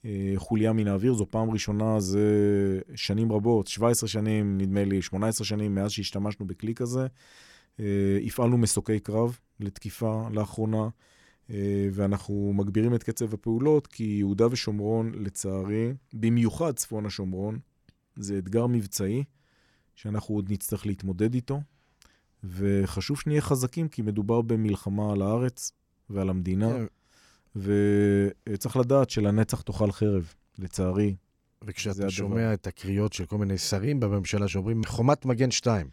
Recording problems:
none

